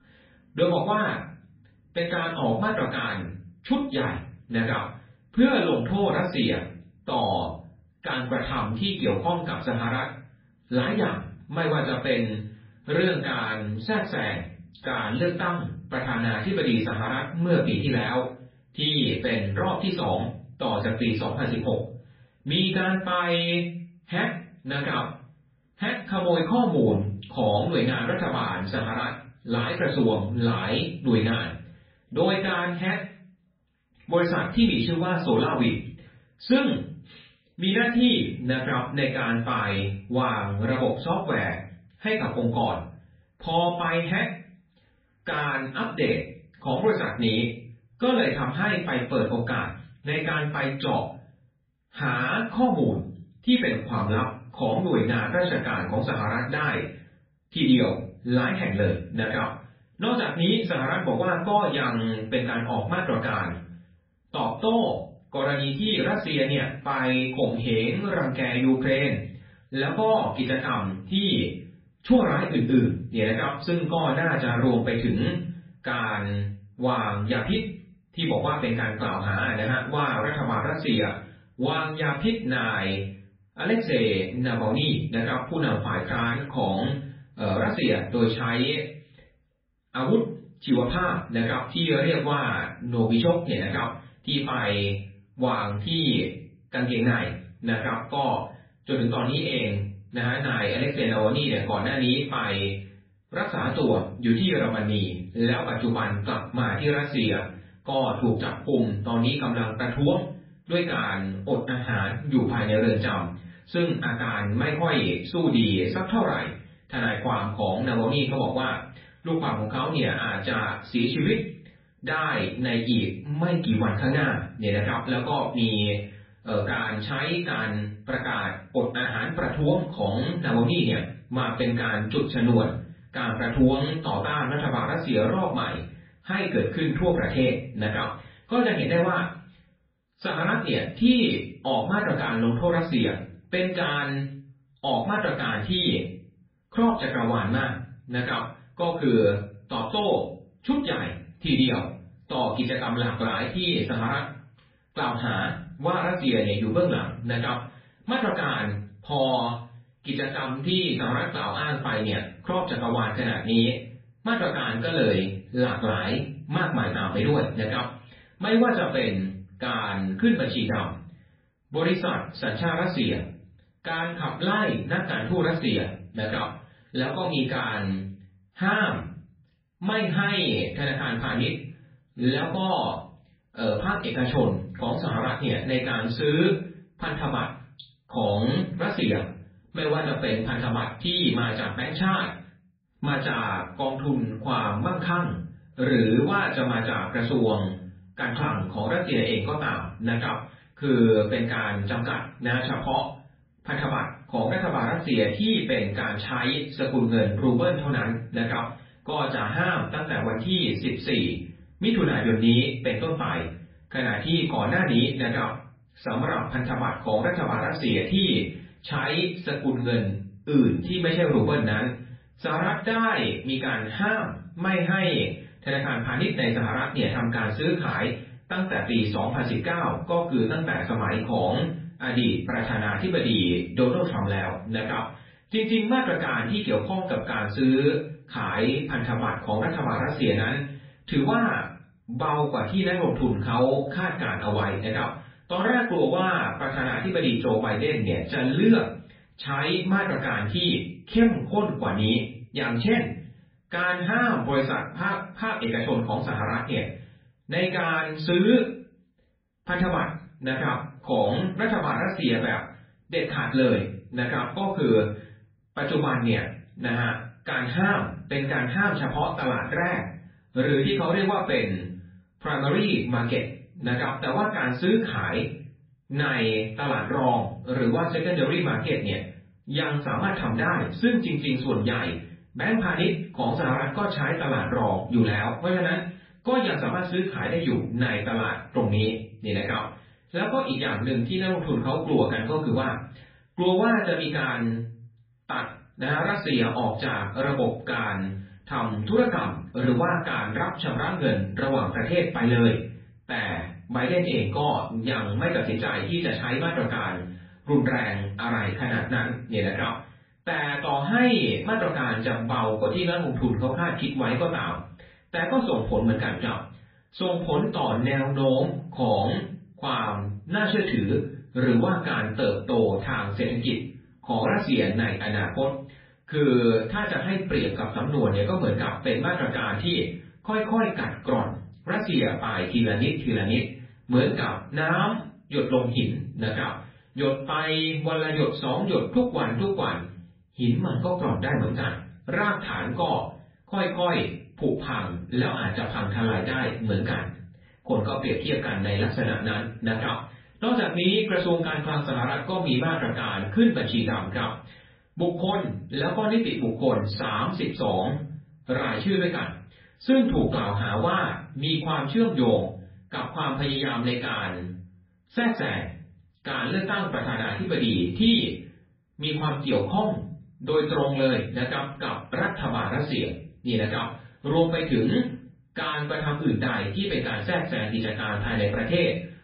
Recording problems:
off-mic speech; far
garbled, watery; badly
muffled; slightly; fading above 4 kHz
room echo; slight; dies away in 0.4 s

